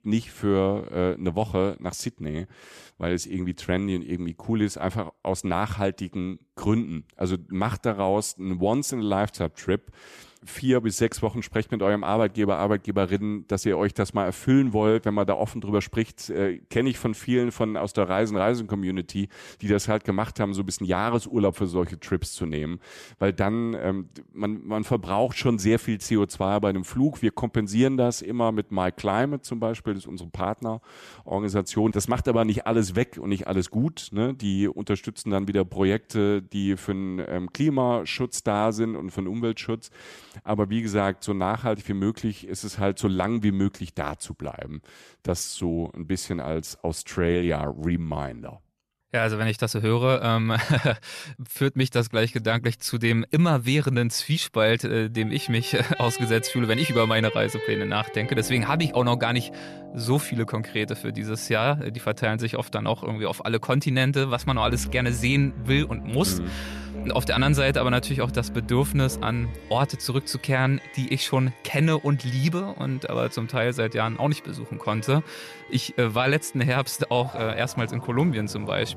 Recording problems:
background music; noticeable; from 53 s on; 10 dB below the speech

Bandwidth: 13.5 kHz